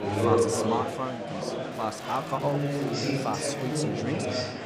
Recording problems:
chatter from many people; very loud; throughout; 4 dB above the speech
crackling; faint; from 1.5 to 3 s and at 3 s; 20 dB below the speech

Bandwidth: 15.5 kHz